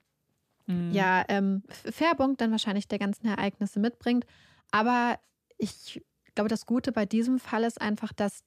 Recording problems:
none

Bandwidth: 14.5 kHz